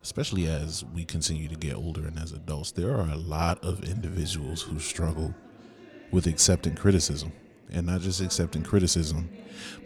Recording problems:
chatter from many people; faint; throughout; 20 dB below the speech

